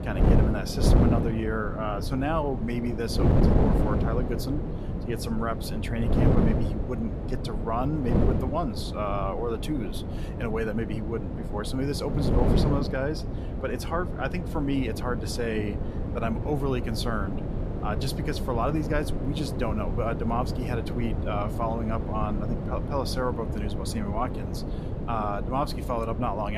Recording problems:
wind noise on the microphone; heavy; 4 dB below the speech
abrupt cut into speech; at the end

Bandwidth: 14.5 kHz